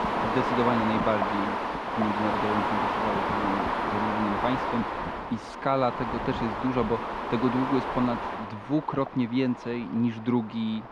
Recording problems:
muffled; very; fading above 4 kHz
wind noise on the microphone; heavy; 4 dB above the speech

